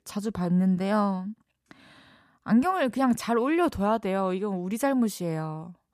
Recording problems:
none

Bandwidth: 14.5 kHz